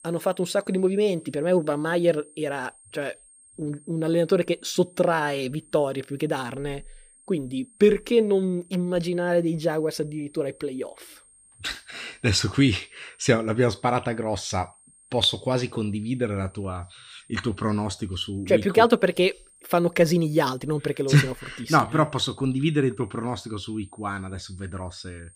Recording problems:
high-pitched whine; faint; throughout; 8.5 kHz, 25 dB below the speech

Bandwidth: 15 kHz